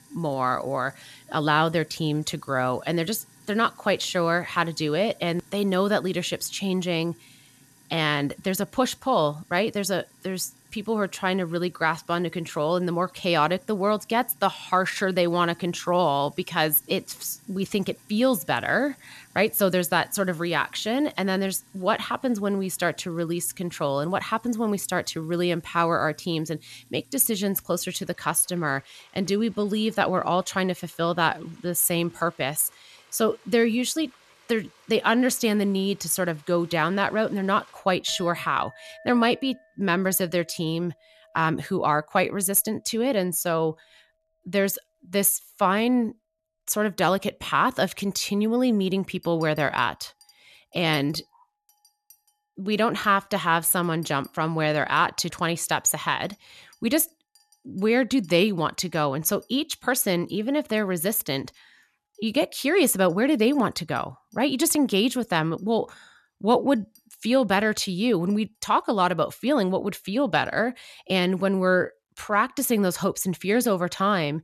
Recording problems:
household noises; faint; throughout; 30 dB below the speech

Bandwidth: 13.5 kHz